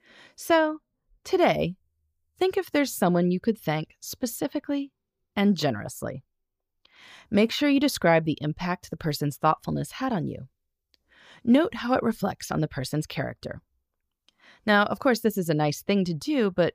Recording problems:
none

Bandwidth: 15 kHz